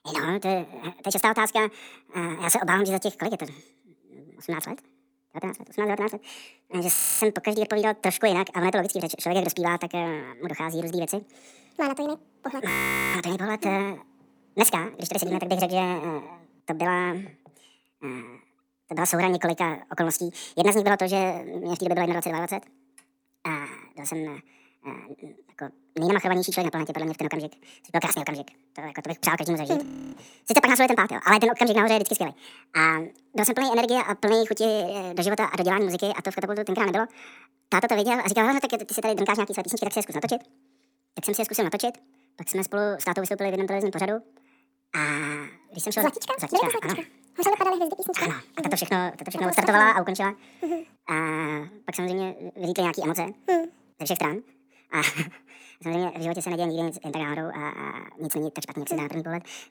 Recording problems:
wrong speed and pitch; too fast and too high; 1.7 times normal speed
audio freezing; at 7 s, at 13 s and at 30 s

